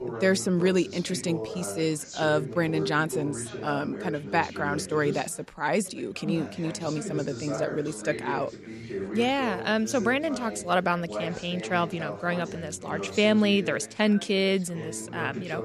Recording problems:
background chatter; loud; throughout; 3 voices, 9 dB below the speech

